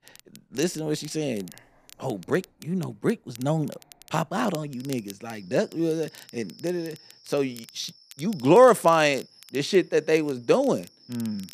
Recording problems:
animal sounds; faint; throughout; 30 dB below the speech
crackle, like an old record; faint; 25 dB below the speech

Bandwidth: 14.5 kHz